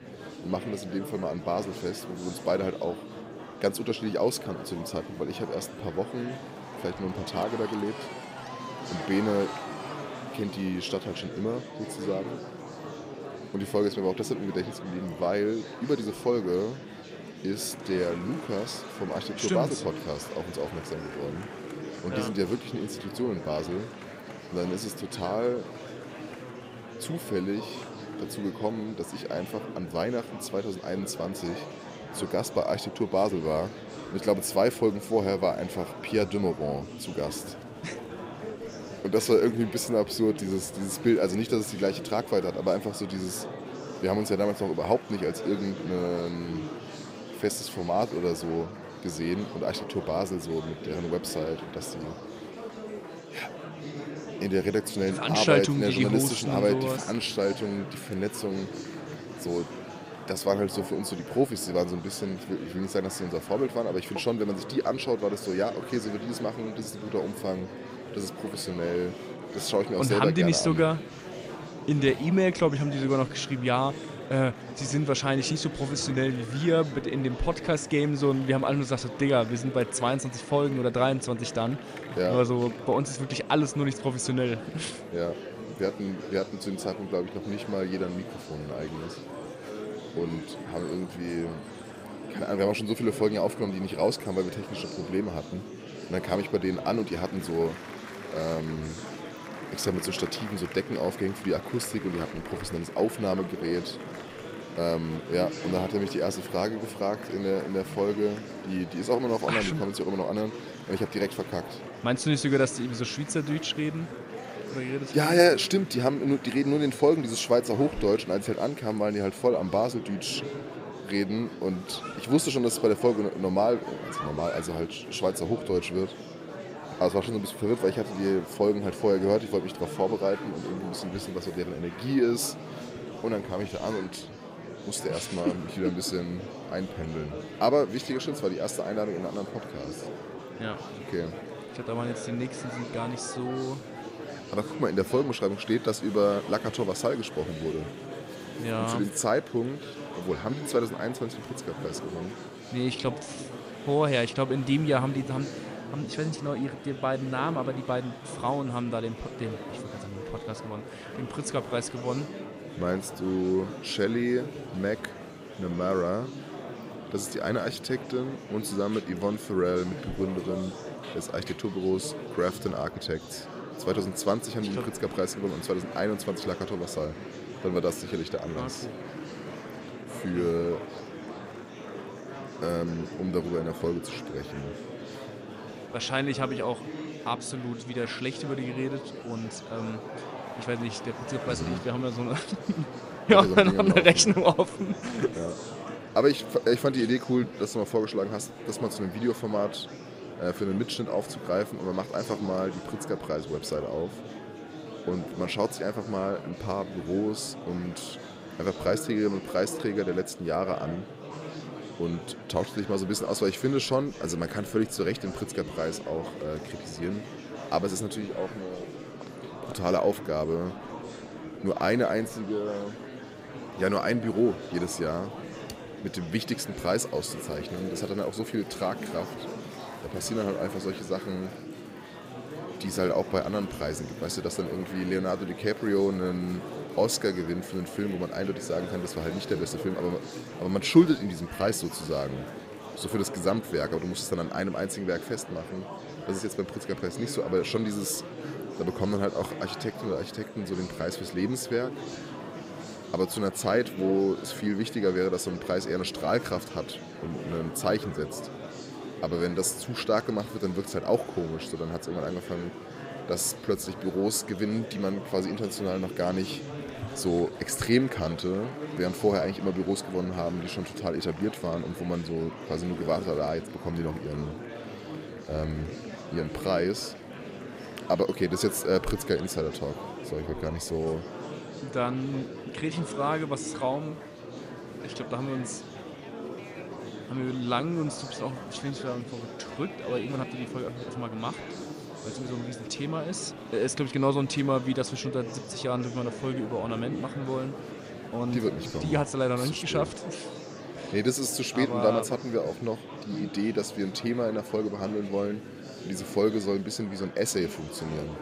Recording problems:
murmuring crowd; noticeable; throughout; 10 dB below the speech

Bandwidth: 15.5 kHz